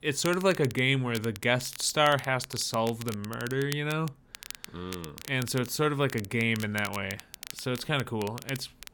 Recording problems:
crackle, like an old record; noticeable; 15 dB below the speech

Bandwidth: 18 kHz